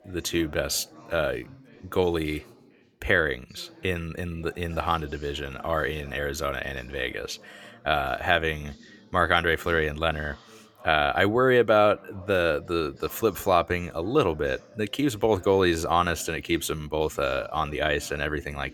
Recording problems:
background chatter; faint; throughout; 3 voices, 25 dB below the speech

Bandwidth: 18.5 kHz